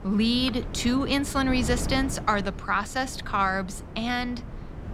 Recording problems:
wind noise on the microphone; occasional gusts; 15 dB below the speech

